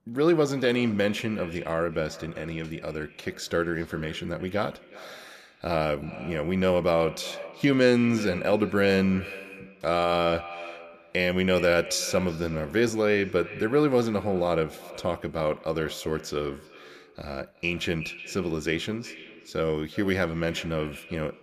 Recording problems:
echo of what is said; noticeable; throughout; 370 ms later, 15 dB below the speech

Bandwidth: 14.5 kHz